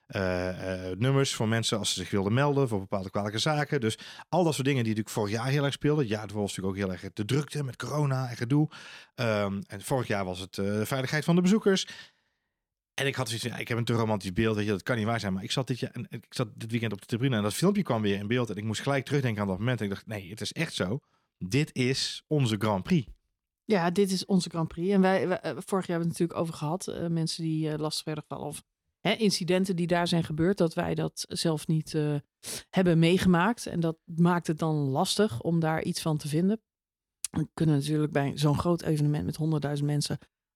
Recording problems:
none

